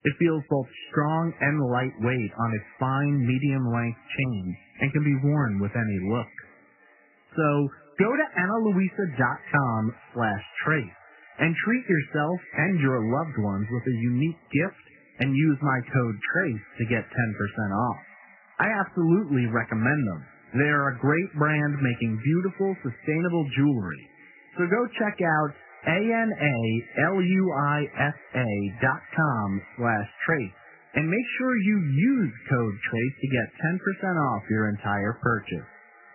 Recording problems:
garbled, watery; badly; nothing above 3 kHz
echo of what is said; faint; throughout; 340 ms later, 20 dB below the speech

